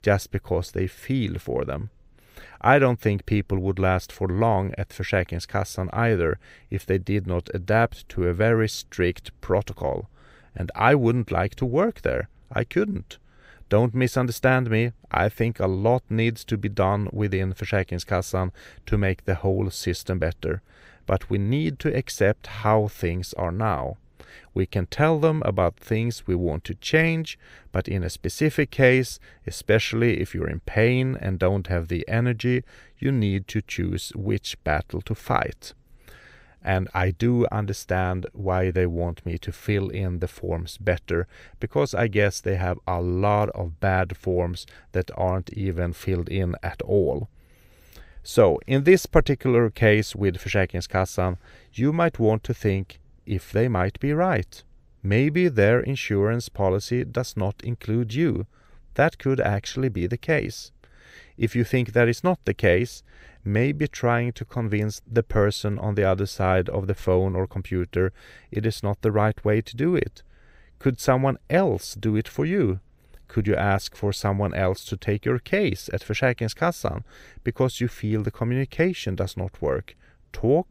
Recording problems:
none

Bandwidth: 15.5 kHz